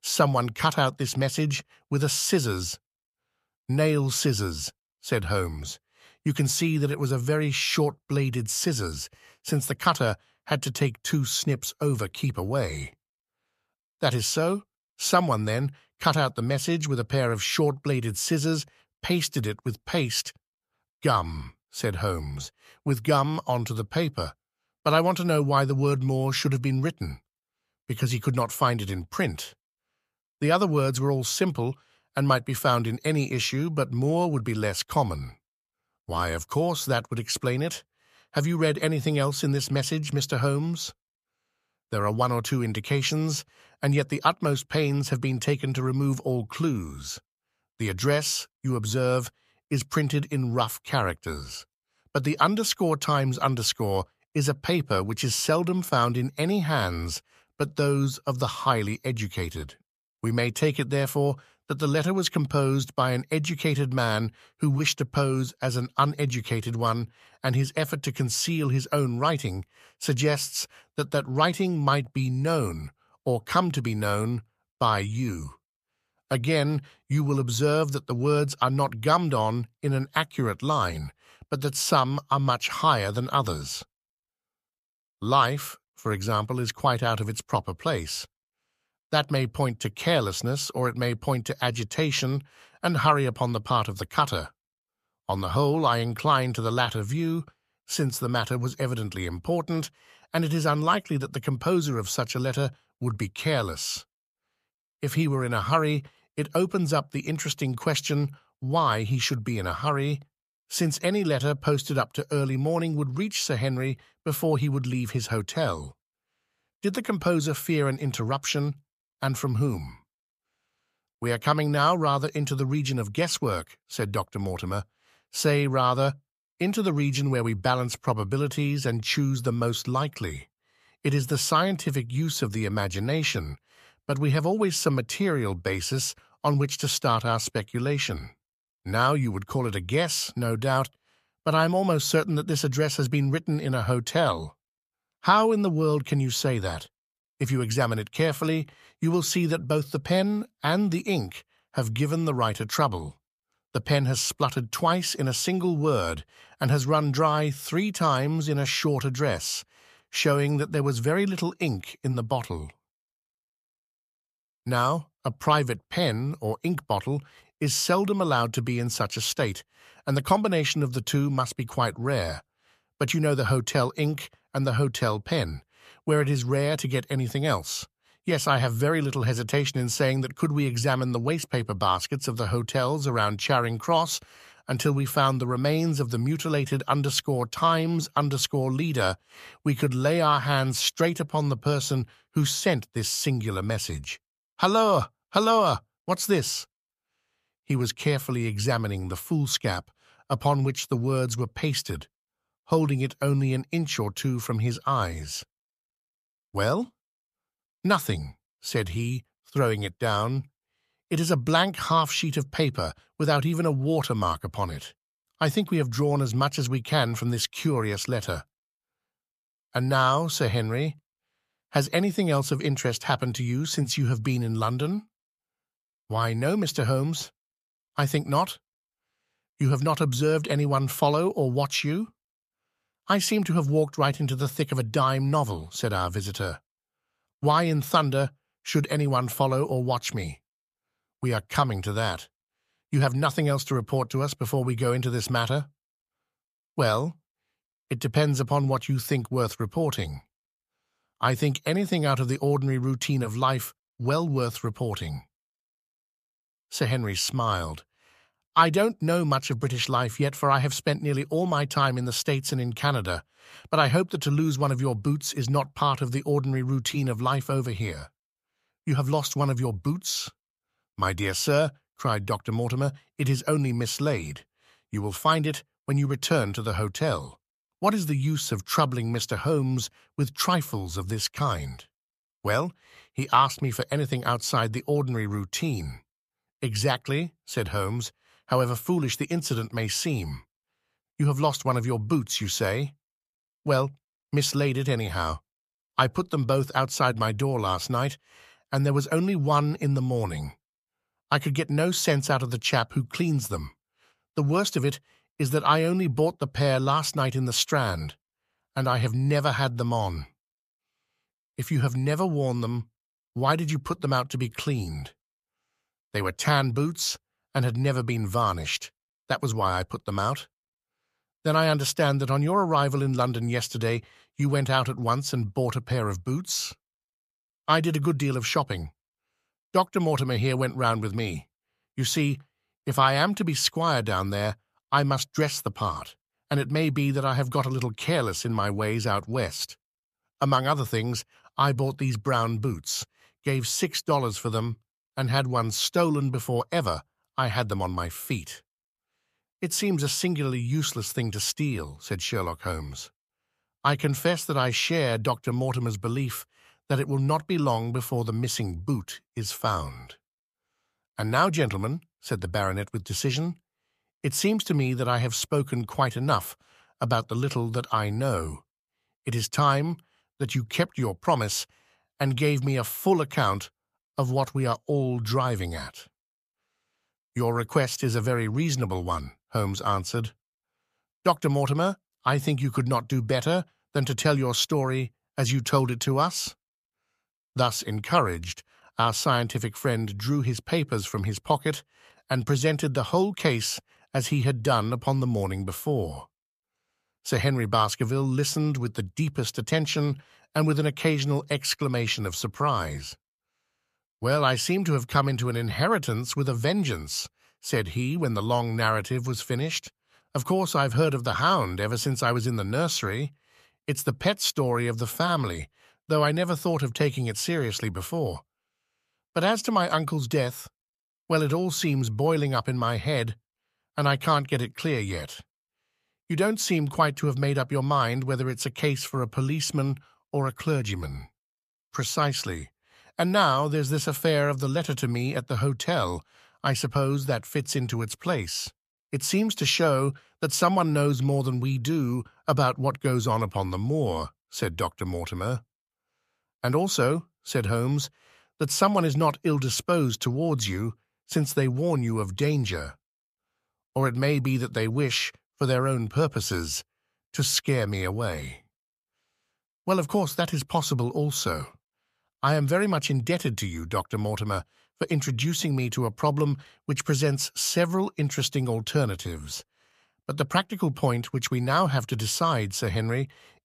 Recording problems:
none

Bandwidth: 14.5 kHz